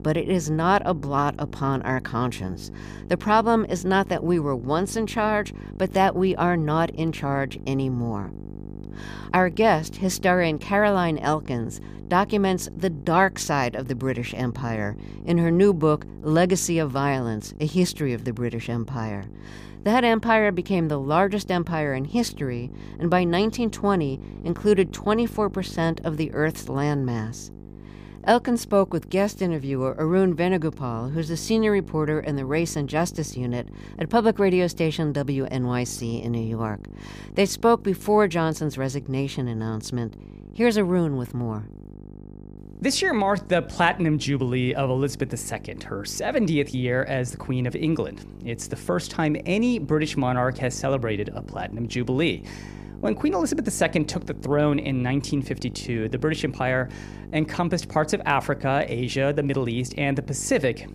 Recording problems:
electrical hum; faint; throughout; 50 Hz, 20 dB below the speech

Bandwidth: 15 kHz